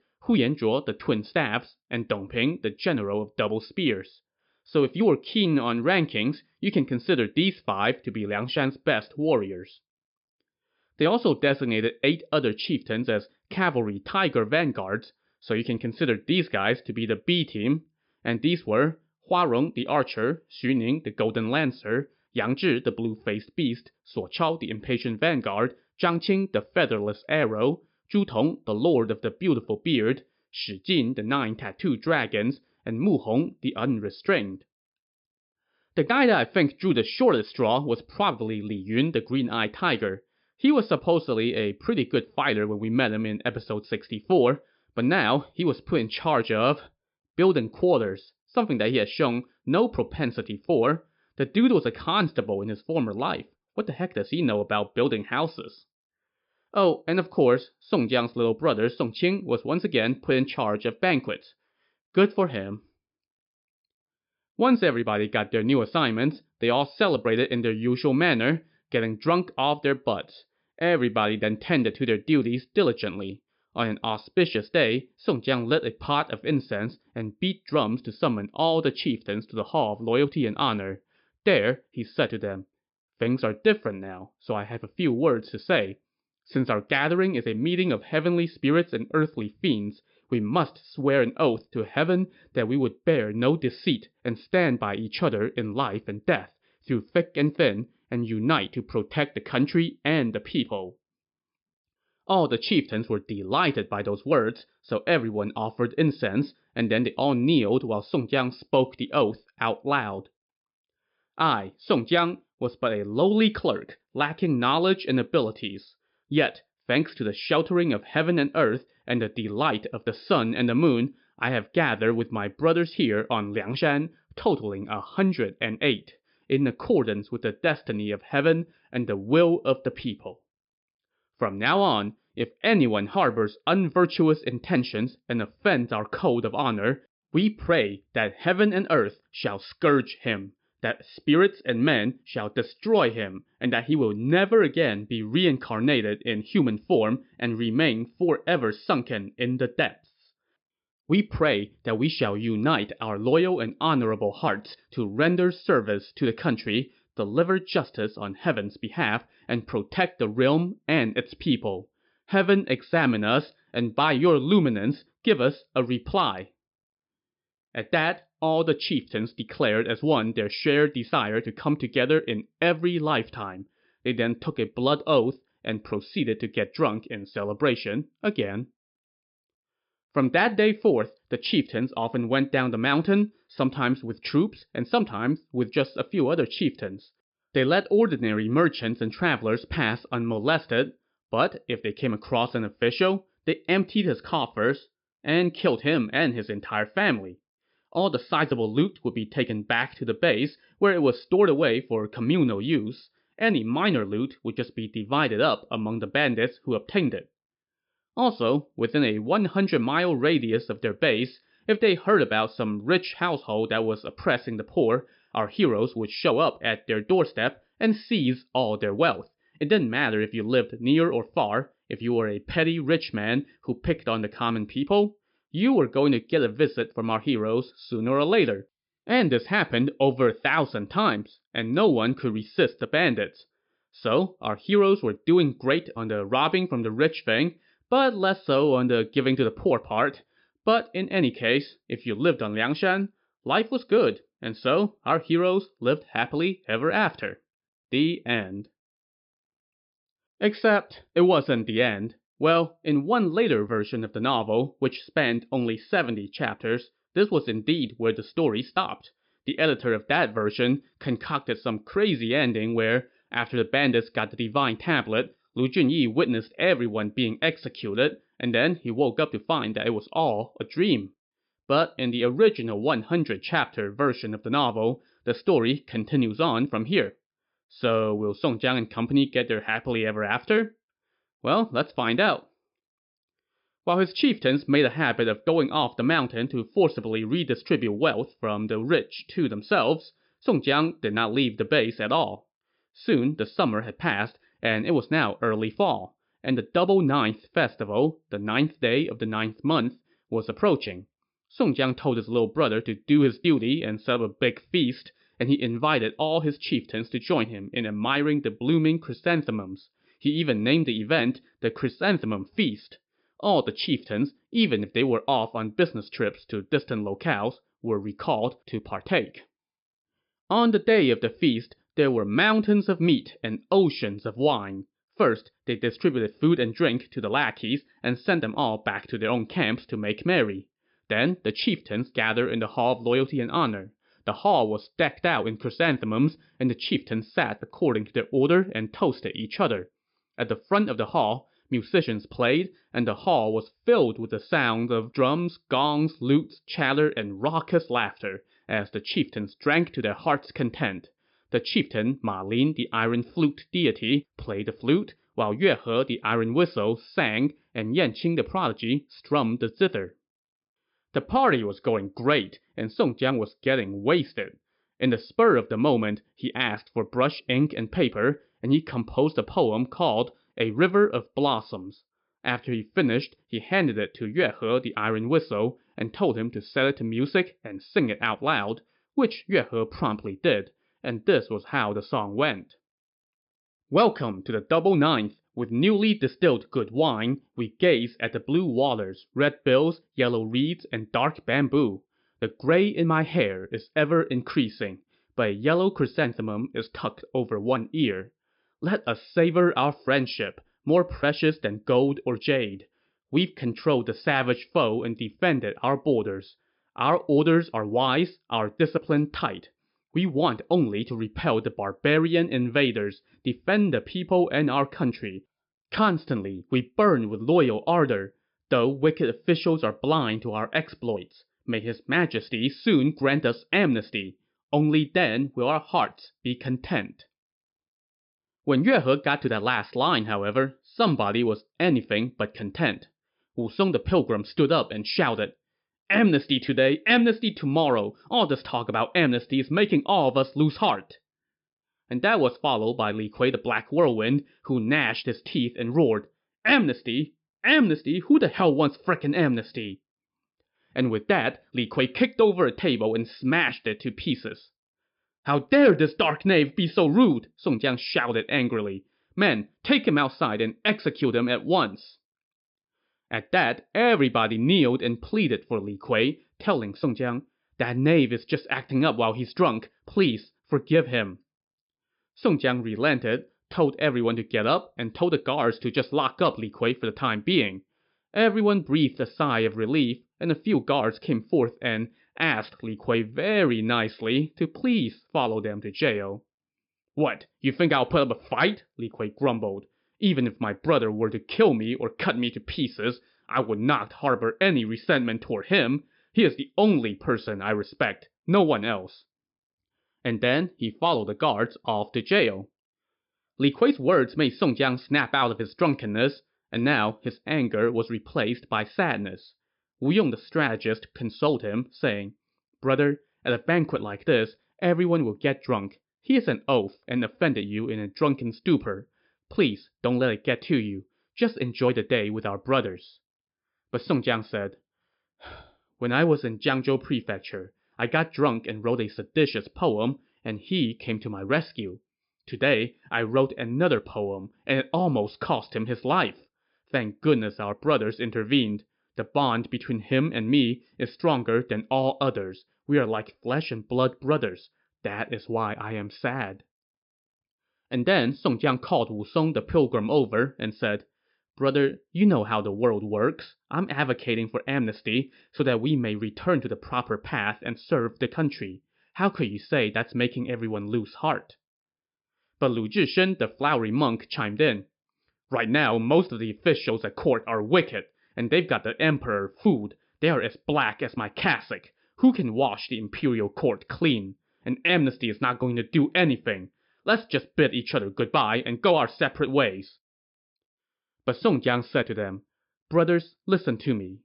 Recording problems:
high frequencies cut off; noticeable; nothing above 5.5 kHz

